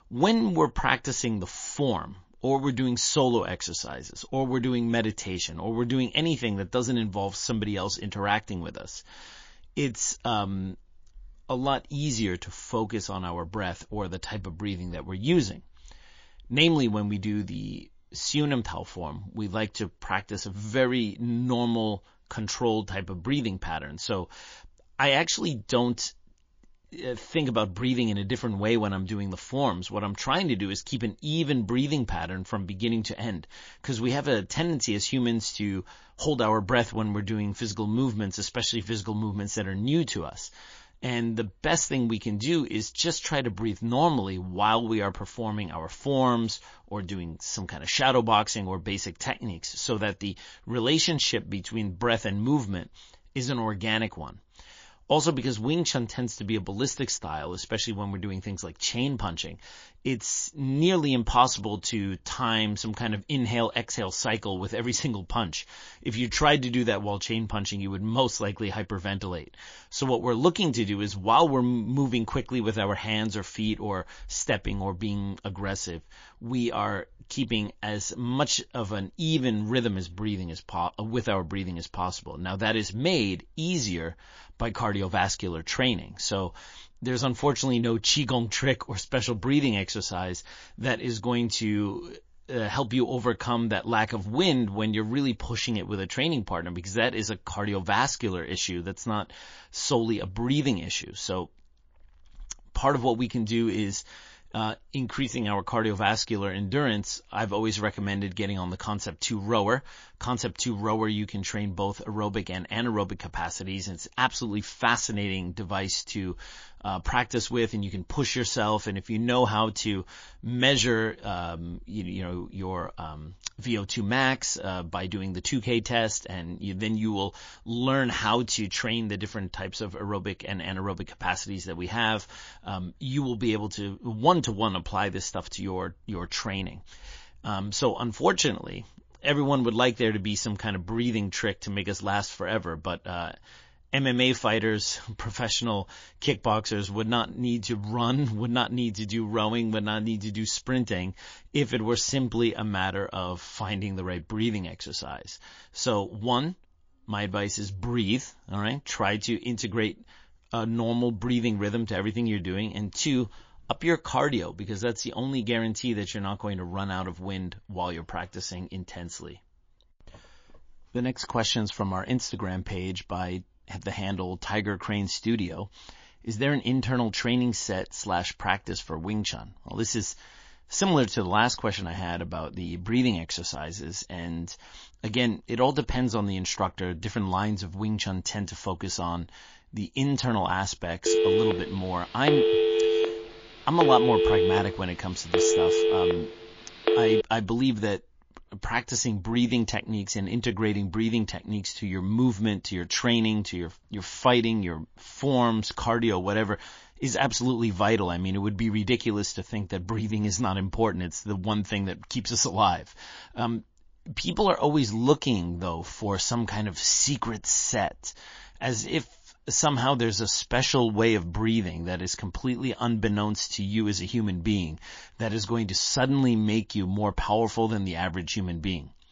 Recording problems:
garbled, watery; slightly
phone ringing; loud; from 3:11 to 3:17; peak 6 dB above the speech

